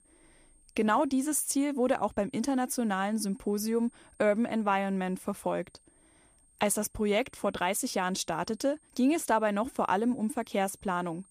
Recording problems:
high-pitched whine; faint; throughout; 8.5 kHz, 30 dB below the speech

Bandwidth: 15 kHz